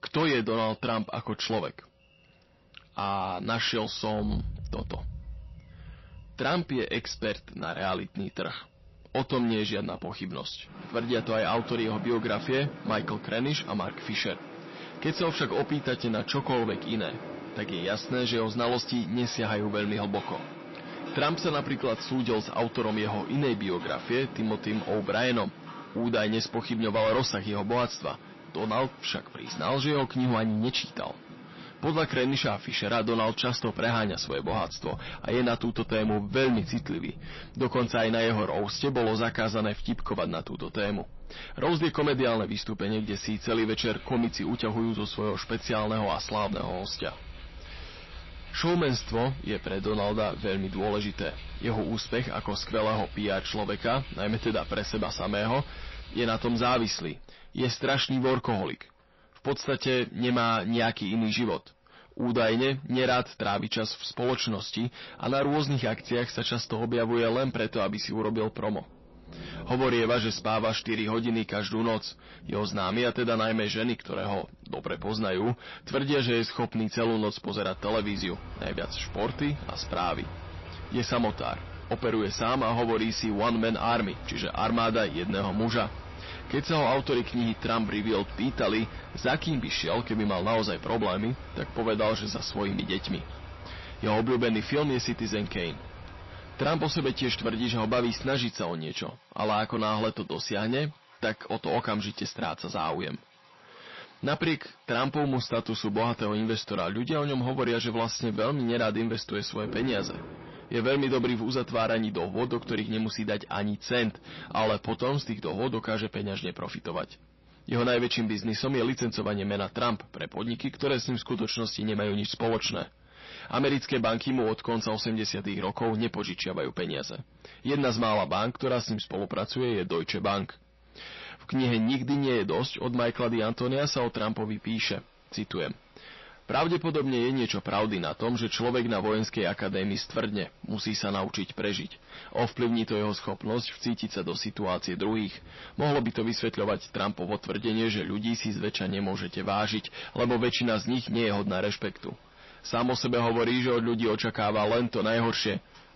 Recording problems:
distortion; heavy; 6 dB below the speech
garbled, watery; slightly; nothing above 5.5 kHz
rain or running water; noticeable; throughout; 15 dB below the speech

